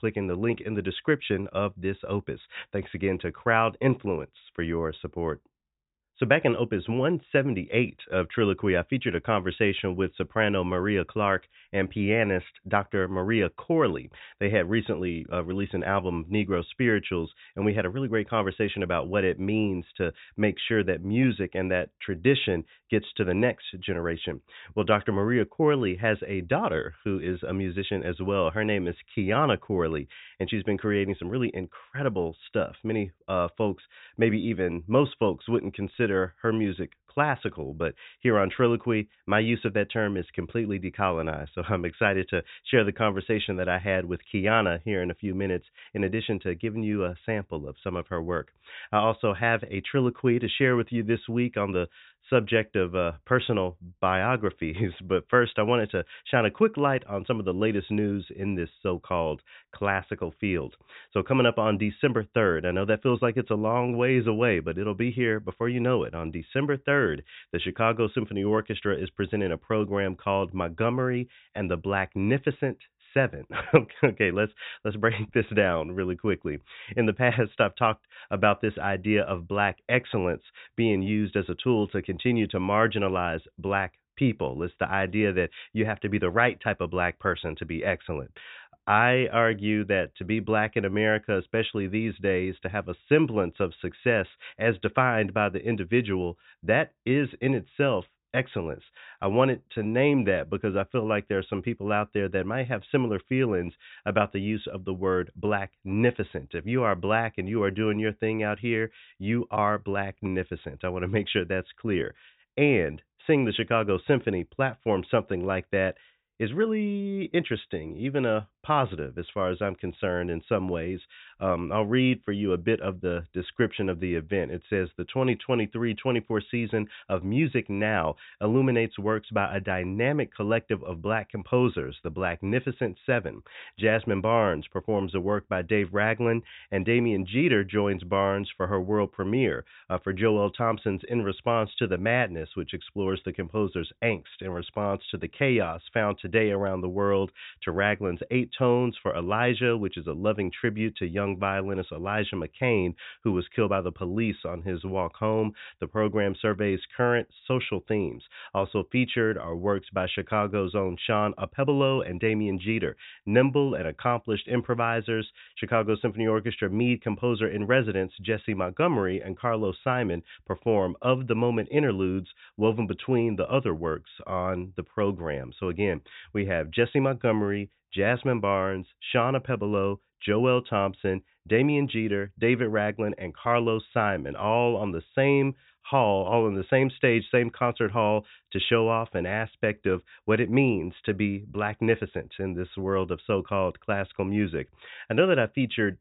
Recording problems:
high frequencies cut off; severe; nothing above 4 kHz

